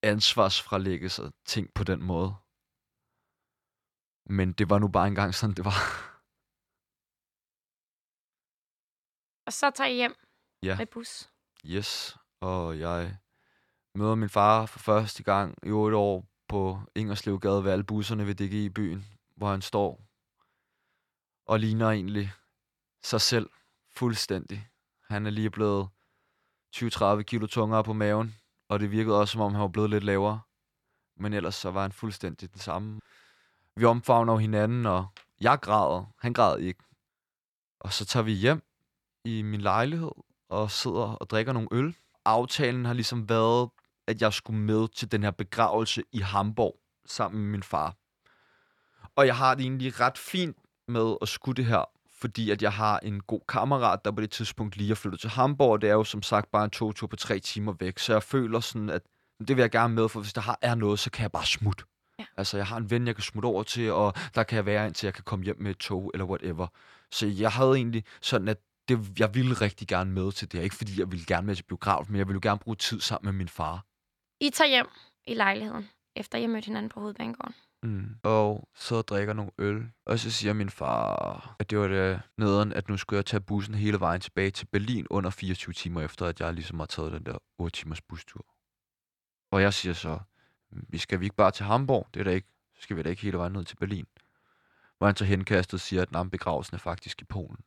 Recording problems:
none

